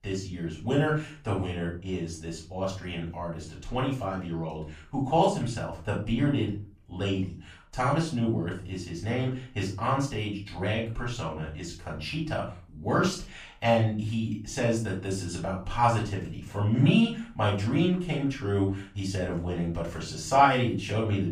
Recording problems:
off-mic speech; far
room echo; slight; dies away in 0.4 s

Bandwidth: 15 kHz